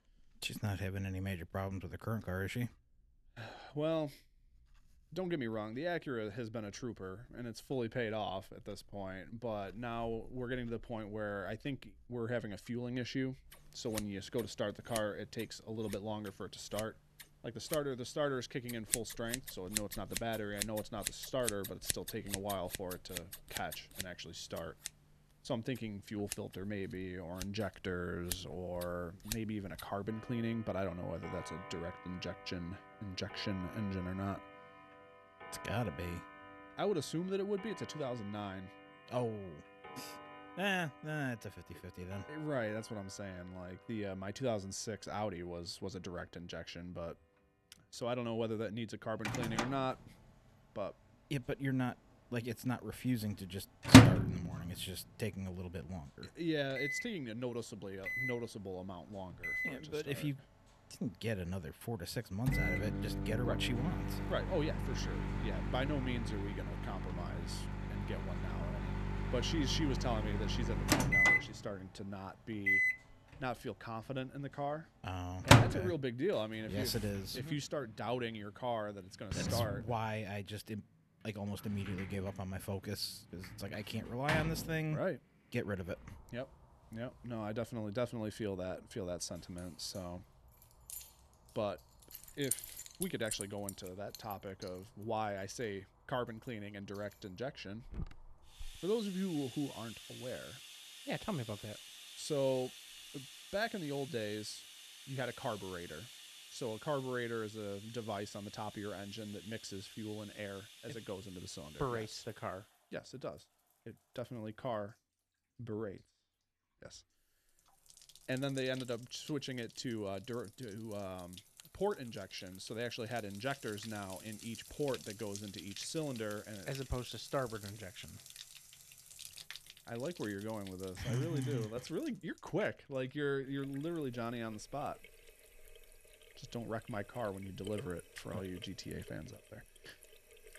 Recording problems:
household noises; very loud; throughout; 4 dB above the speech

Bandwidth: 13.5 kHz